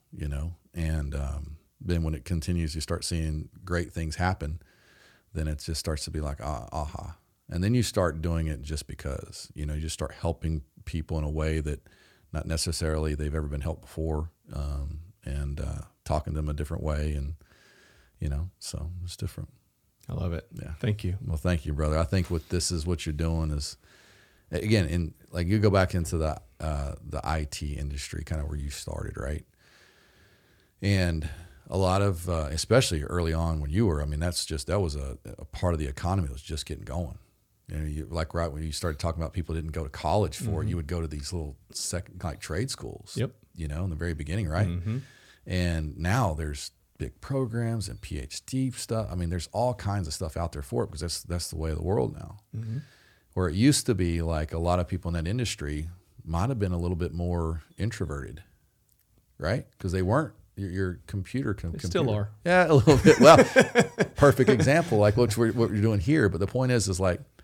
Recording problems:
none

